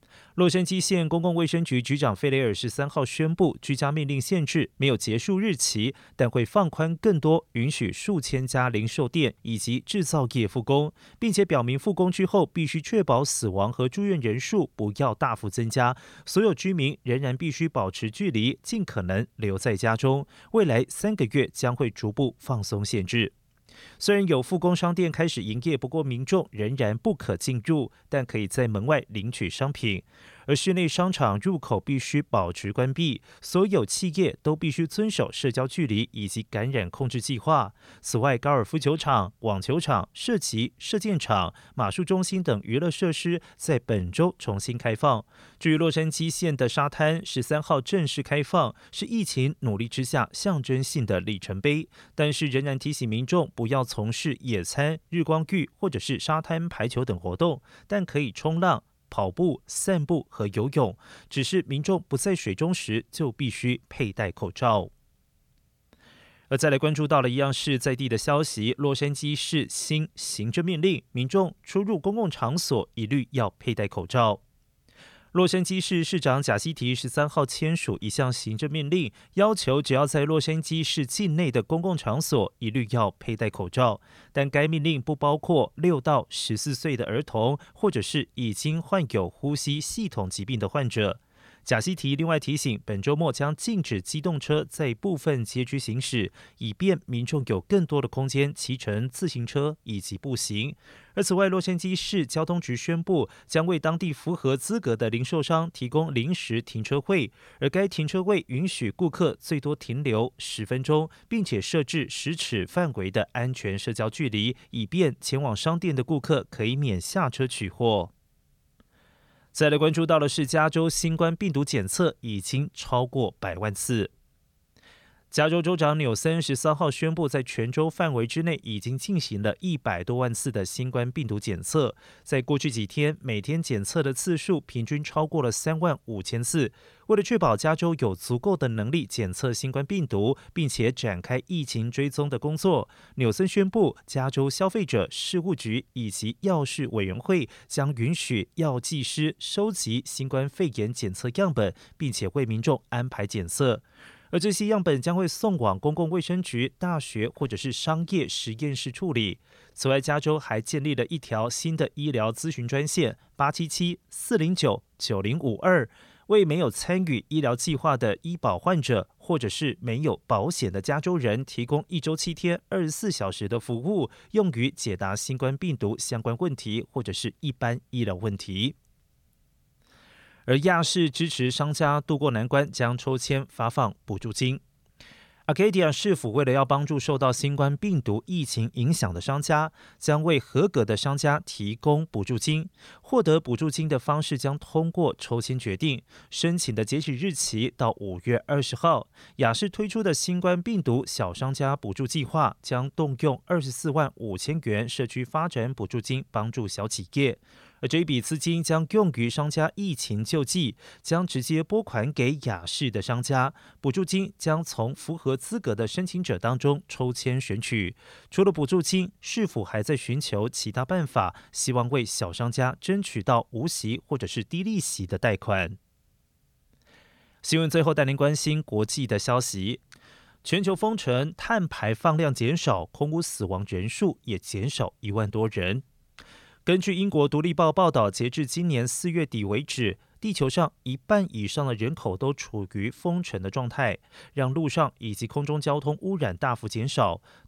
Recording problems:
none

